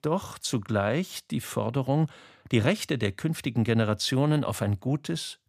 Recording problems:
none

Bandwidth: 15 kHz